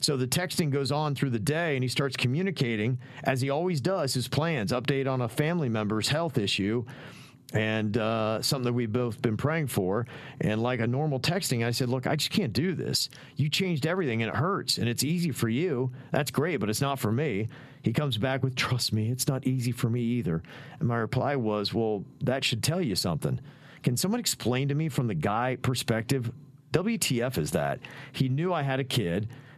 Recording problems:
squashed, flat; somewhat

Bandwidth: 14 kHz